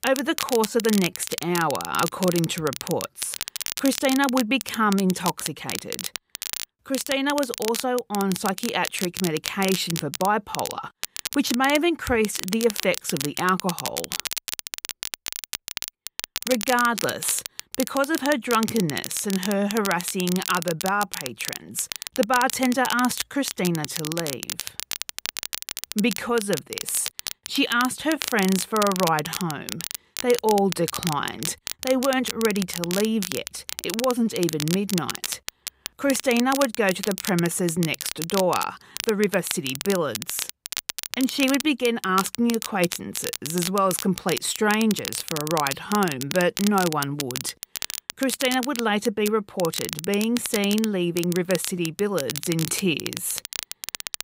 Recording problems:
crackle, like an old record; loud; 7 dB below the speech

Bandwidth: 15.5 kHz